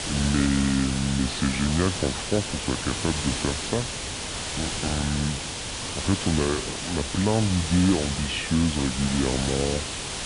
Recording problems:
wrong speed and pitch; too slow and too low; 0.7 times normal speed
high frequencies cut off; slight; nothing above 5 kHz
hiss; loud; throughout; 3 dB below the speech

